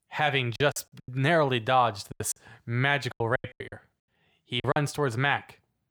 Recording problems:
choppy; very; from 0.5 to 2.5 s and from 3 to 5 s; 19% of the speech affected

